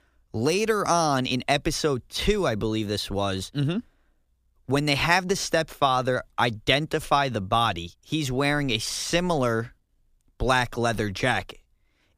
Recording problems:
none

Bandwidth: 15 kHz